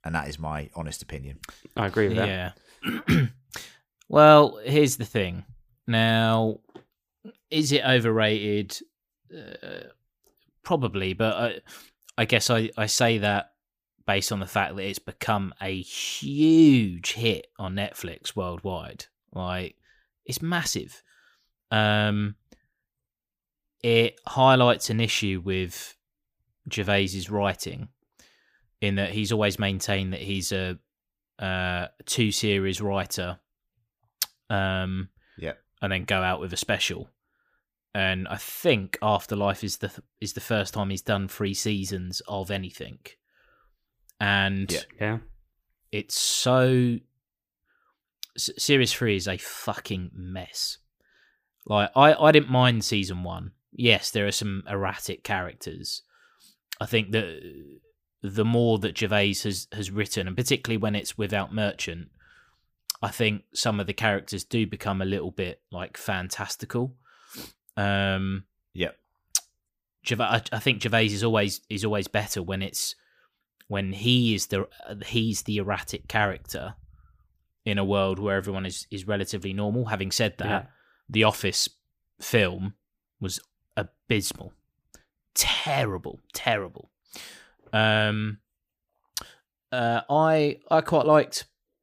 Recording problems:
none

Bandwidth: 15 kHz